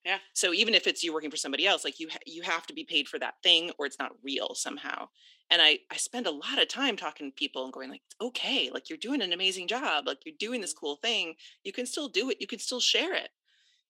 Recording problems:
thin; very slightly; fading below 300 Hz

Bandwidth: 16 kHz